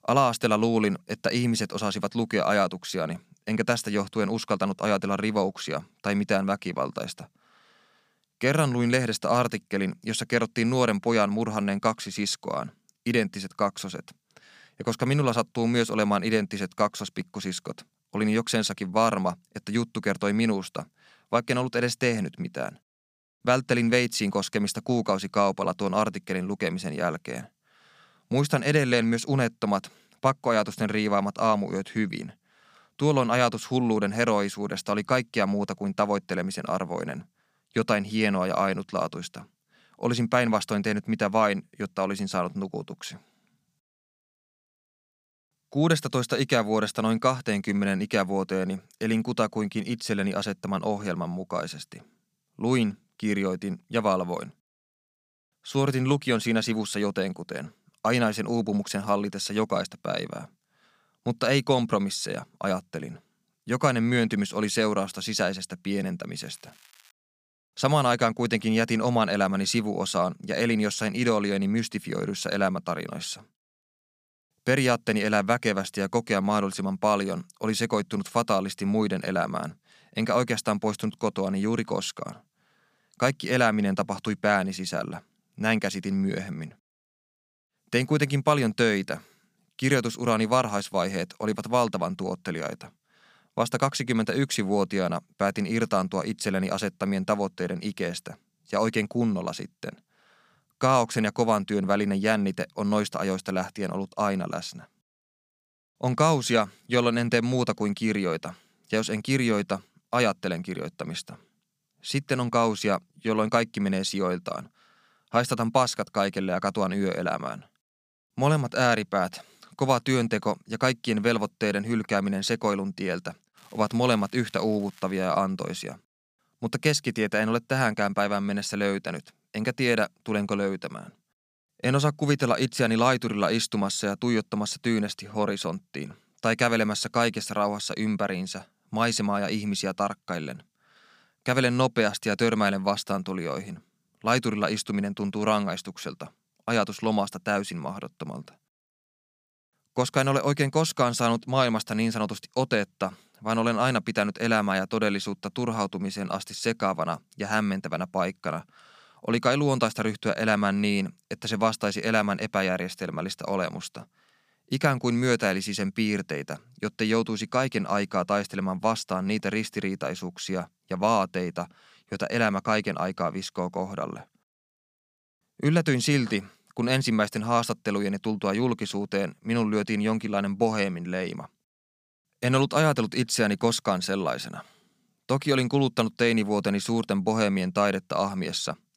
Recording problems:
crackling; faint; at 1:06 and from 2:04 to 2:05; 30 dB below the speech

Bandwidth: 15 kHz